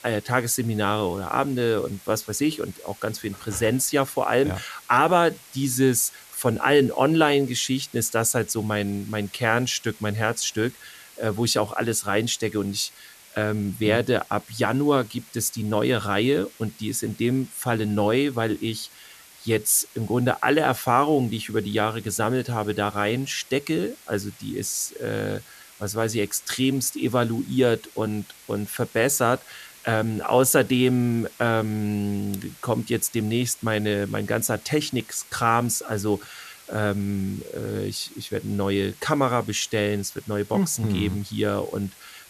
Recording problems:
hiss; faint; throughout; 20 dB below the speech

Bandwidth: 14 kHz